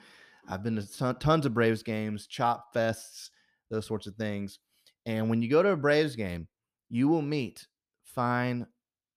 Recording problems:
none

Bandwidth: 14.5 kHz